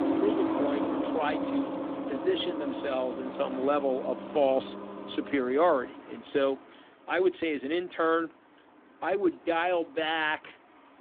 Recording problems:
phone-call audio; nothing above 3.5 kHz
traffic noise; loud; throughout; 4 dB below the speech

